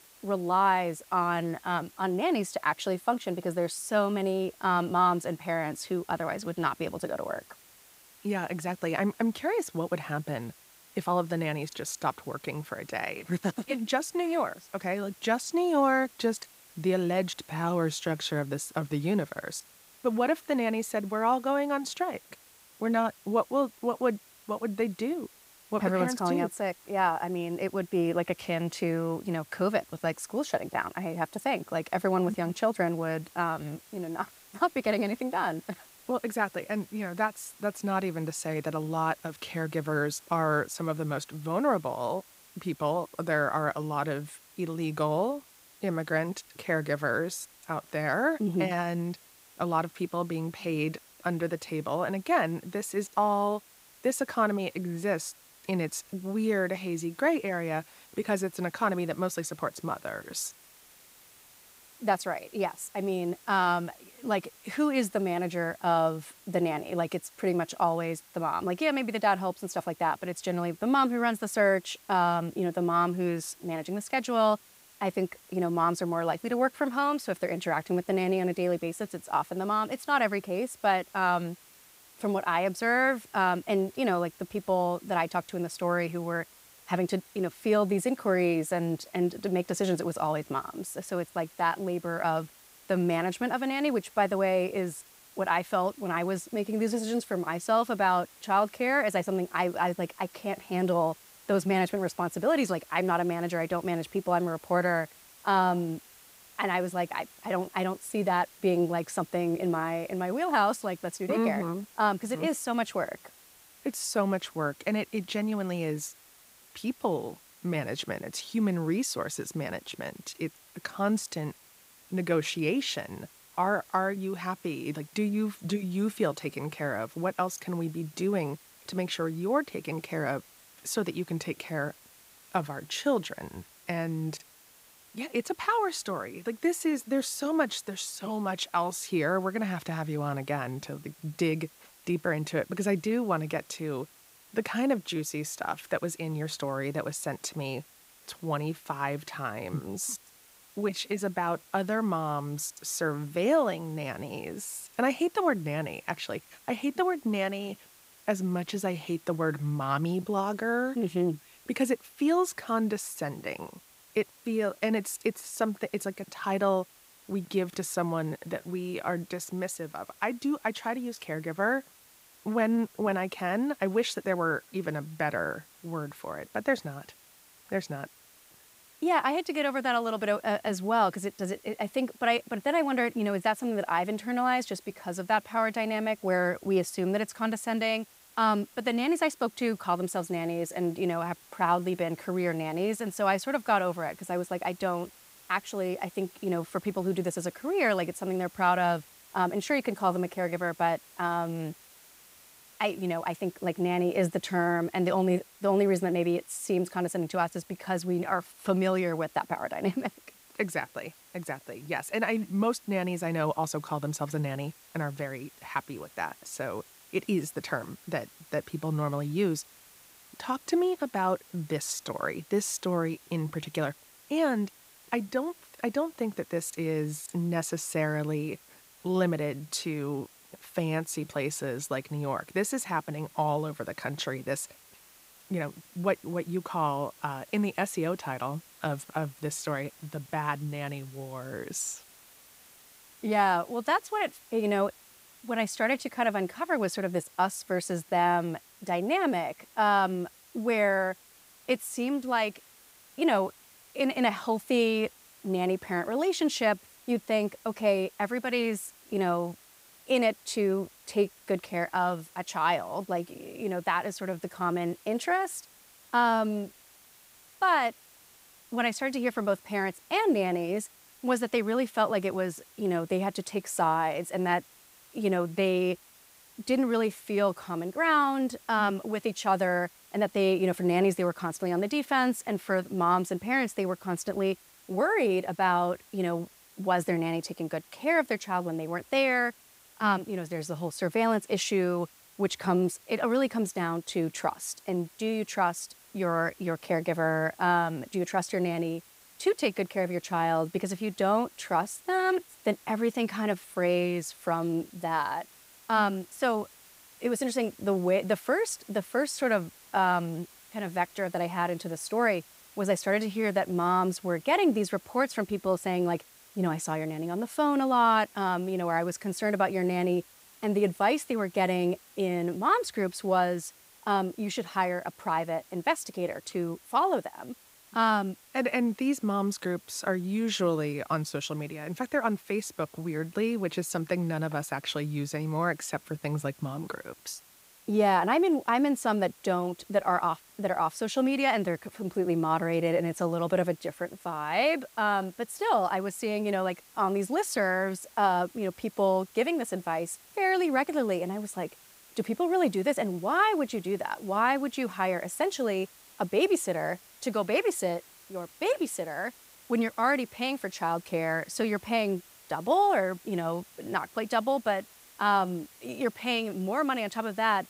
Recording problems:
hiss; faint; throughout; 25 dB below the speech

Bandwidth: 15.5 kHz